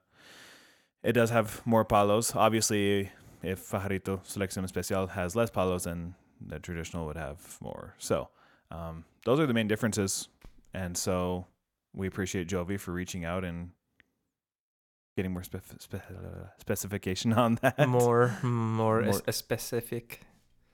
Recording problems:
none

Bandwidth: 17 kHz